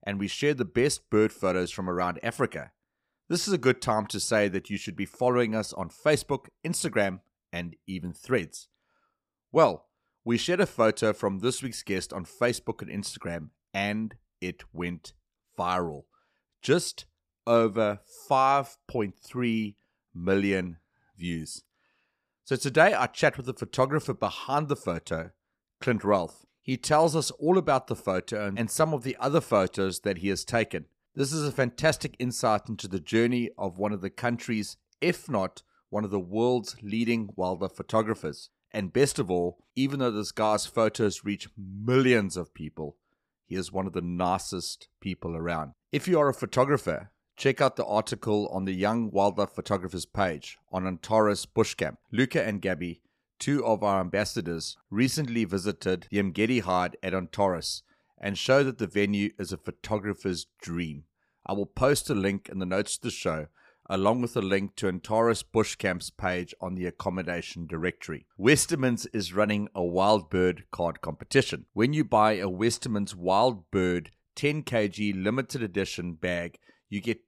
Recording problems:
none

